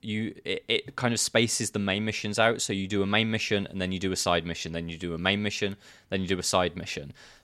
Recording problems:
none

